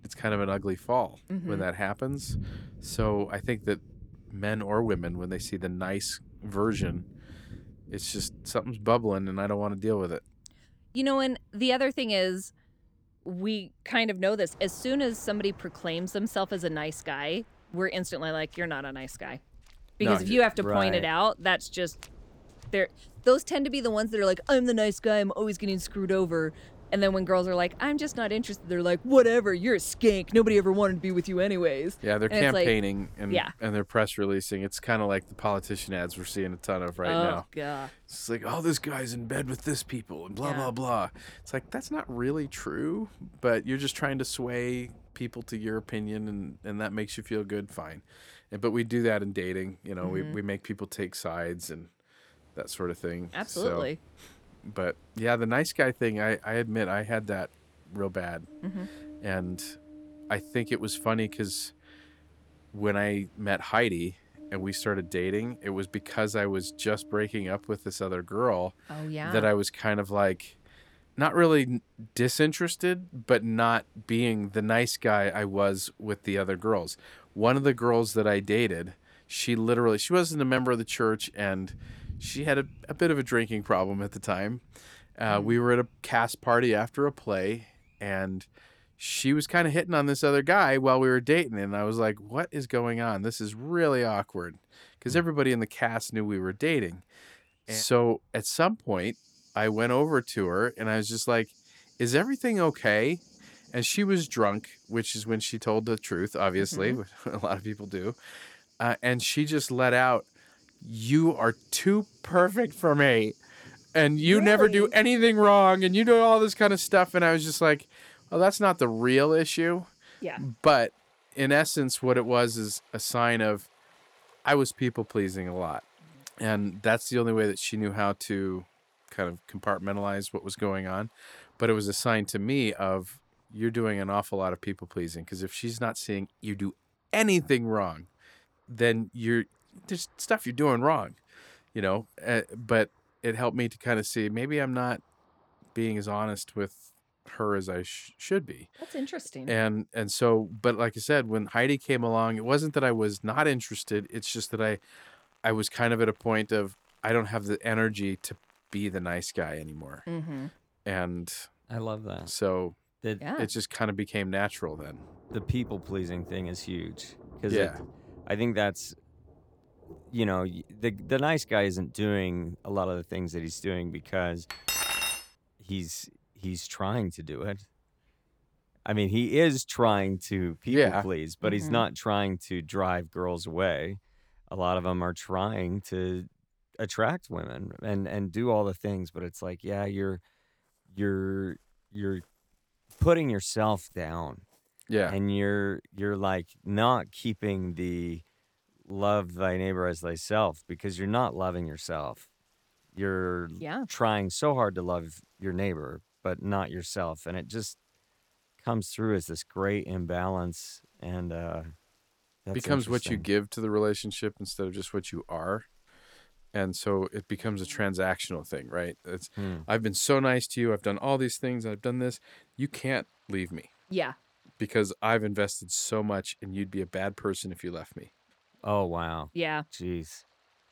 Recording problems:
rain or running water; faint; throughout; 25 dB below the speech
clattering dishes; loud; at 2:55; peak 2 dB above the speech

